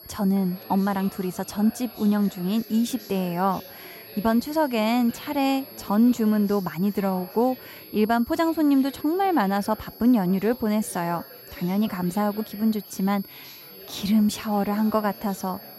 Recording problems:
high-pitched whine; noticeable; throughout; 11.5 kHz, 20 dB below the speech
chatter from many people; faint; throughout; 20 dB below the speech

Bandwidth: 16 kHz